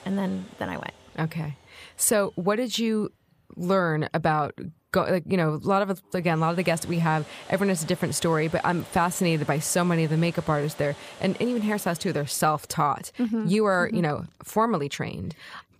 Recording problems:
household noises; noticeable; throughout; 20 dB below the speech

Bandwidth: 15 kHz